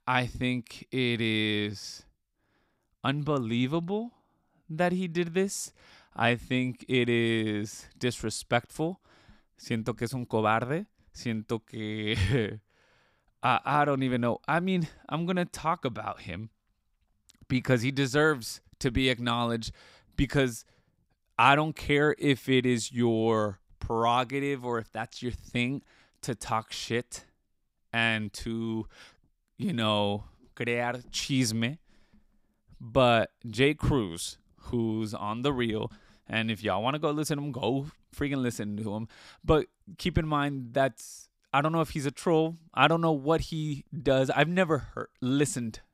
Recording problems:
none

